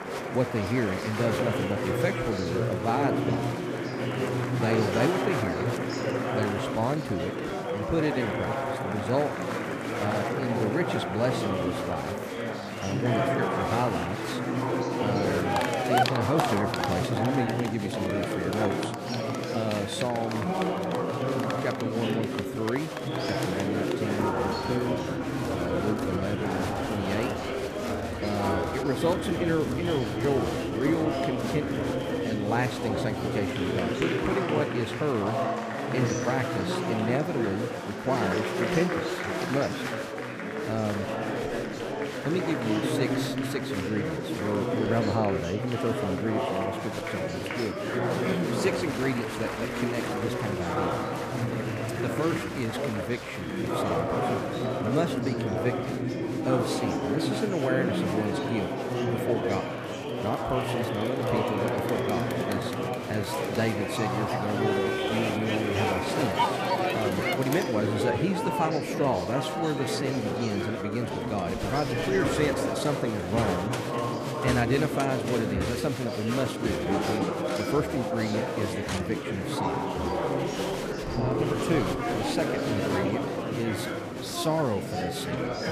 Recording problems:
murmuring crowd; very loud; throughout; 2 dB above the speech

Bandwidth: 14.5 kHz